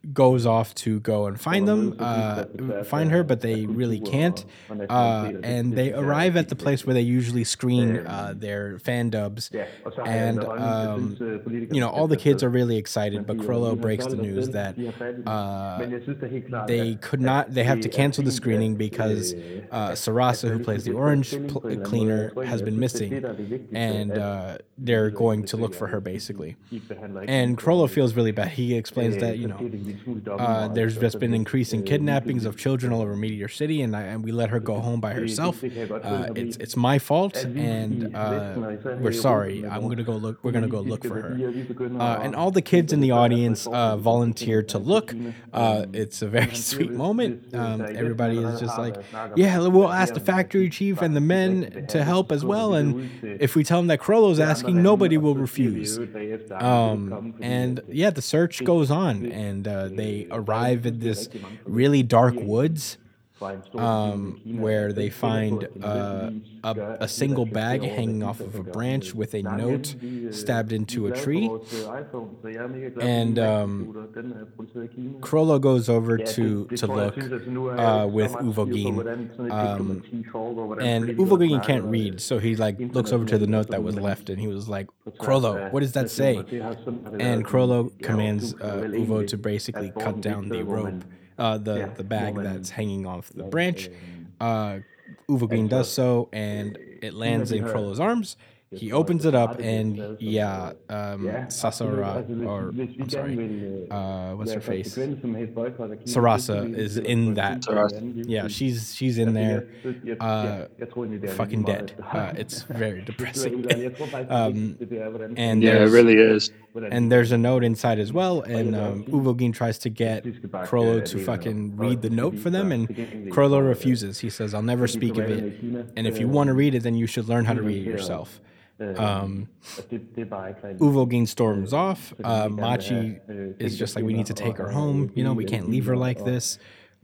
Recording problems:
voice in the background; loud; throughout; 9 dB below the speech

